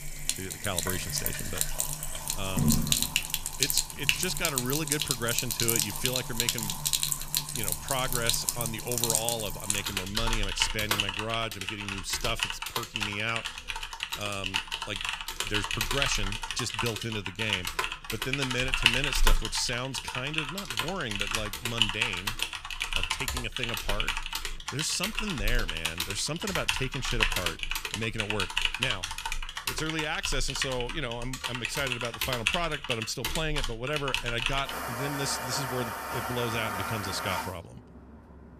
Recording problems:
household noises; very loud; throughout; 3 dB above the speech

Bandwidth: 14.5 kHz